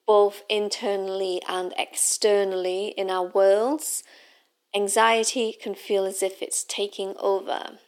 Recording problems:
thin; somewhat; fading below 300 Hz

